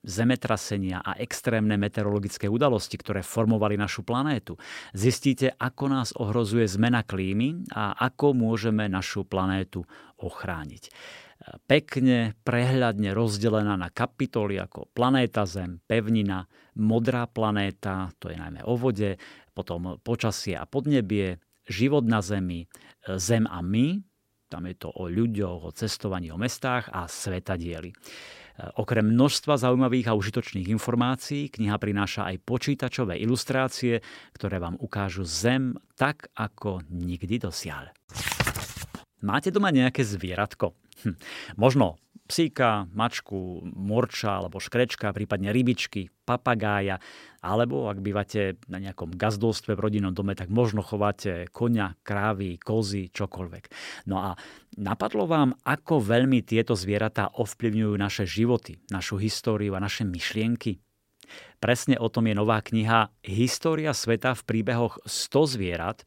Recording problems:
none

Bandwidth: 16 kHz